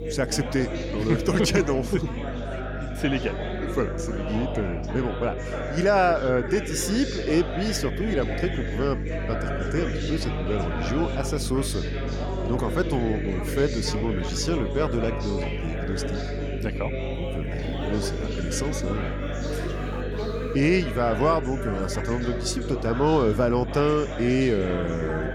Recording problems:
background chatter; loud; throughout; 3 voices, 7 dB below the speech
electrical hum; noticeable; throughout; 50 Hz, 15 dB below the speech
alarm; faint; at 20 s; peak 15 dB below the speech

